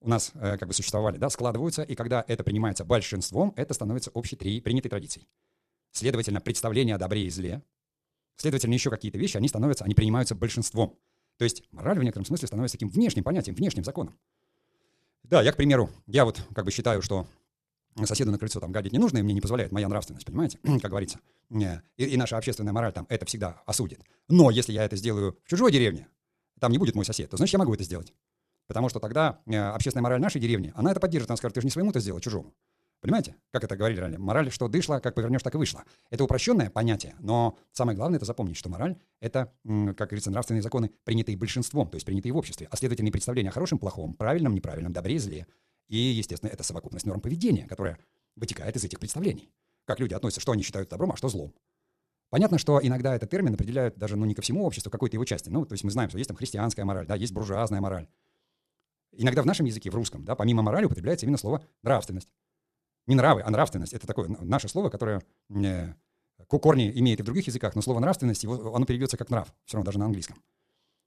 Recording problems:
wrong speed, natural pitch; too fast; 1.6 times normal speed

